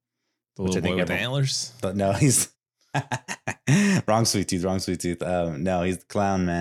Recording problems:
abrupt cut into speech; at the end

